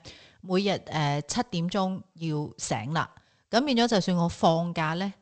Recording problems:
garbled, watery; slightly; nothing above 8 kHz

